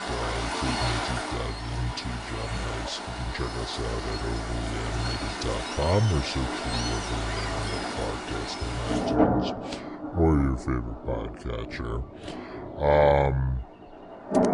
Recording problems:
wrong speed and pitch; too slow and too low; 0.7 times normal speed
rain or running water; loud; throughout; 2 dB below the speech

